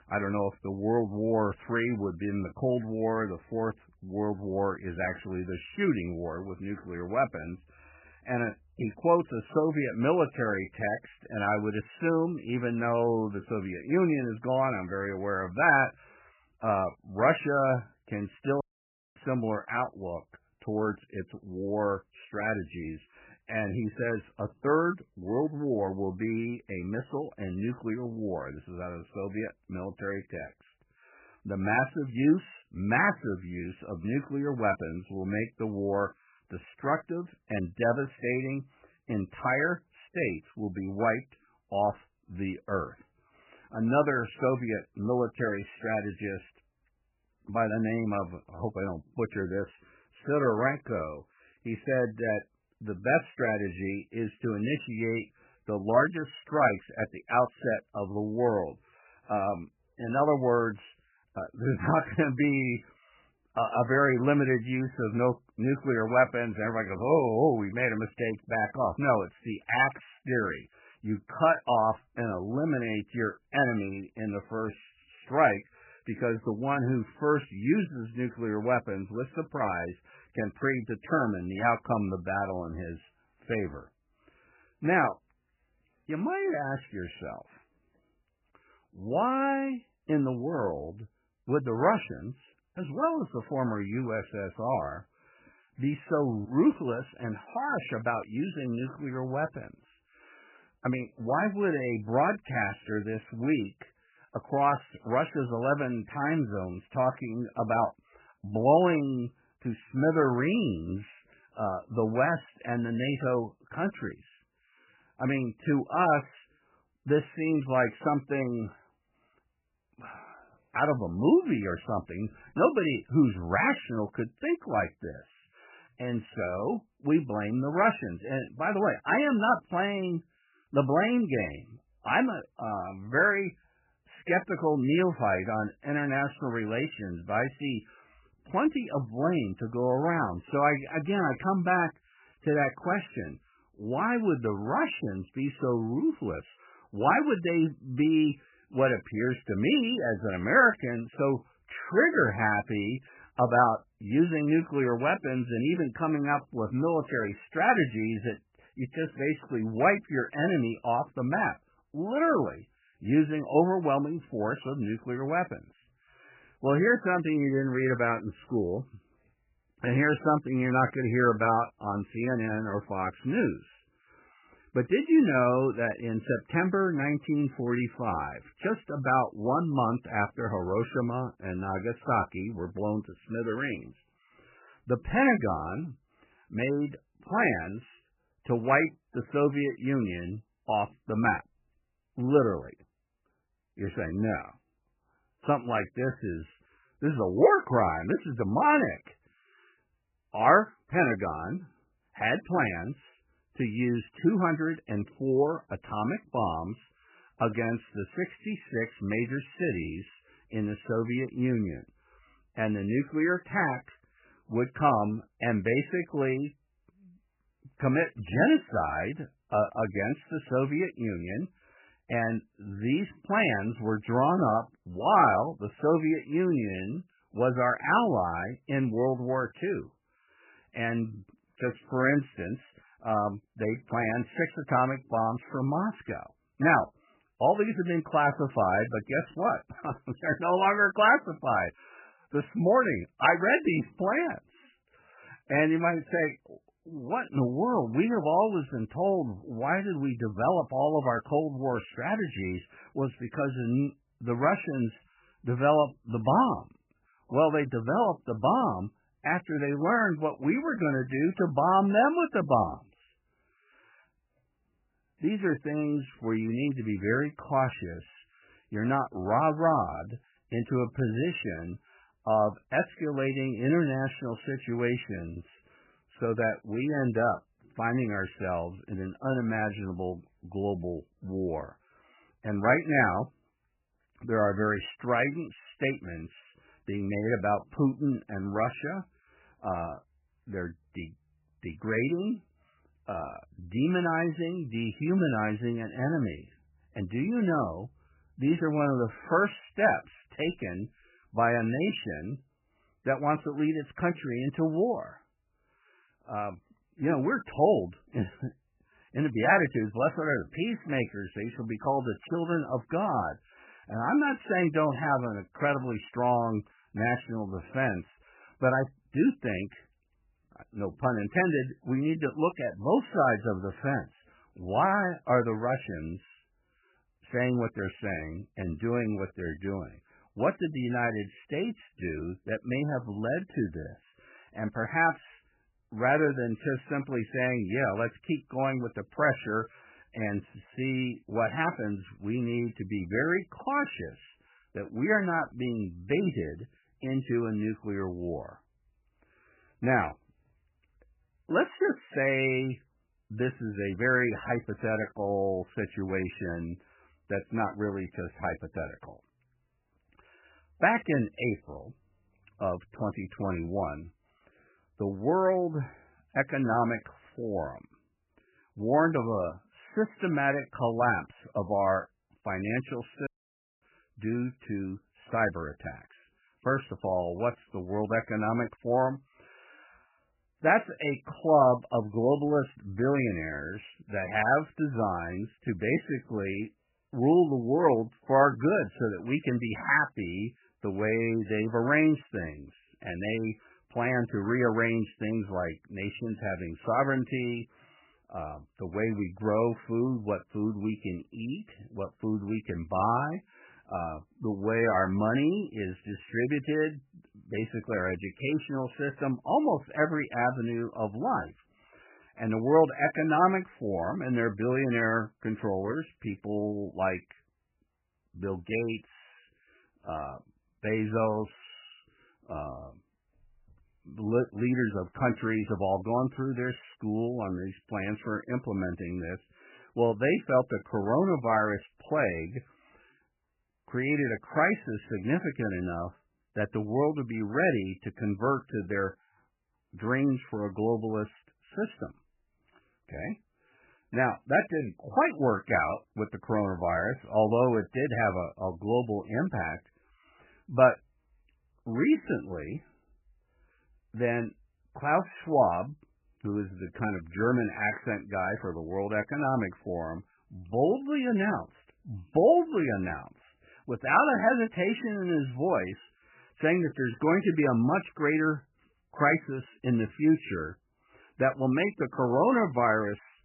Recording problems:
garbled, watery; badly; nothing above 3 kHz
audio cutting out; at 19 s for 0.5 s and at 6:13 for 0.5 s

